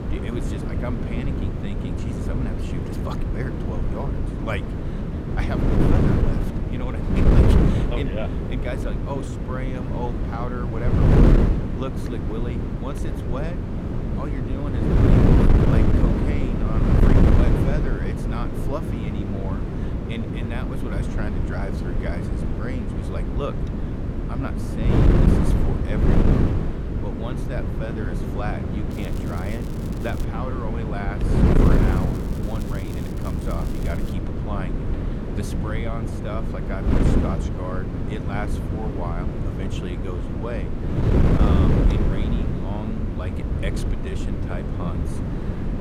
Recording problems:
wind noise on the microphone; heavy; 4 dB above the speech
crackling; noticeable; from 29 to 30 s and from 32 to 34 s; 15 dB below the speech

